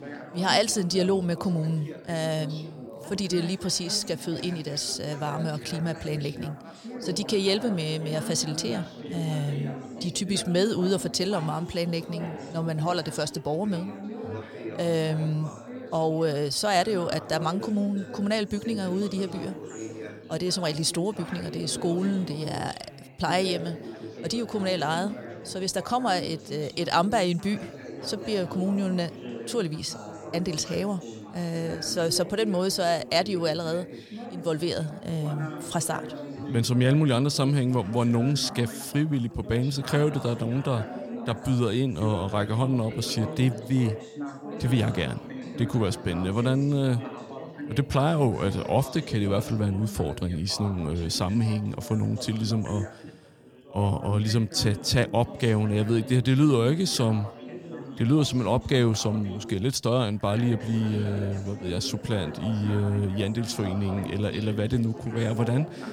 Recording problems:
background chatter; noticeable; throughout; 4 voices, 10 dB below the speech

